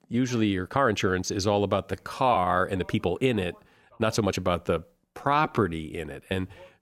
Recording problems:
voice in the background; faint; throughout; 30 dB below the speech
uneven, jittery; strongly; from 0.5 to 6 s

